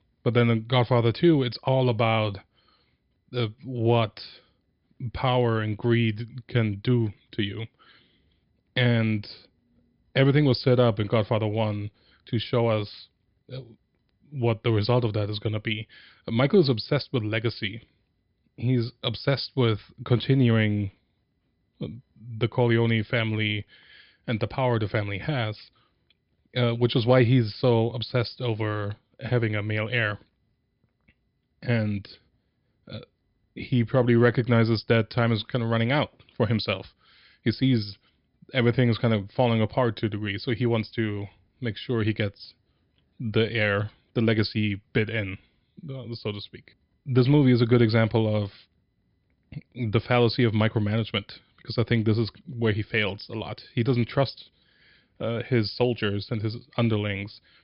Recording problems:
high frequencies cut off; noticeable; nothing above 5.5 kHz

